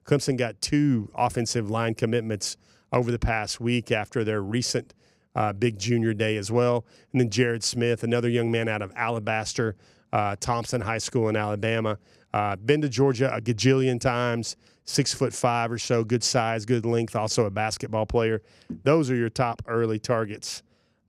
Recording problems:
none

